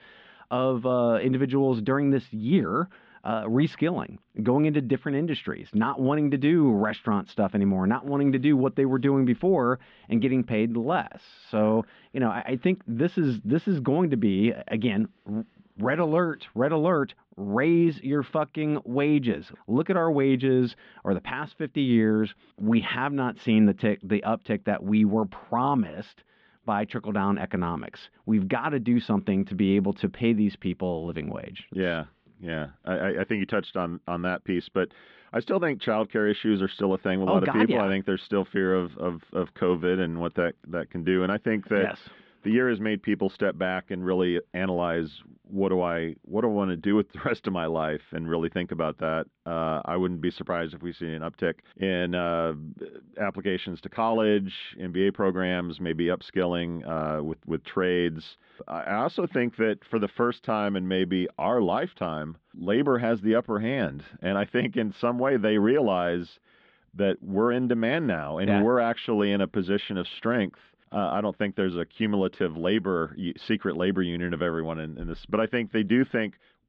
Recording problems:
muffled; very; fading above 3.5 kHz

